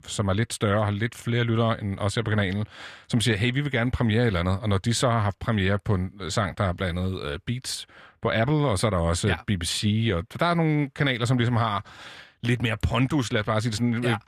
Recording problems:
none

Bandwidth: 14 kHz